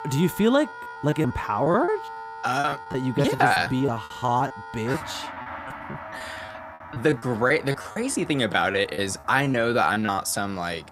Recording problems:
background music; noticeable; throughout; 15 dB below the speech
choppy; very; 14% of the speech affected

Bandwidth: 15.5 kHz